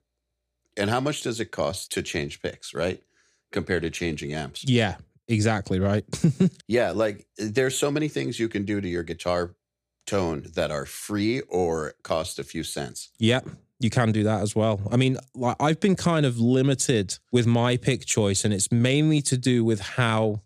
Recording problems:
none

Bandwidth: 14.5 kHz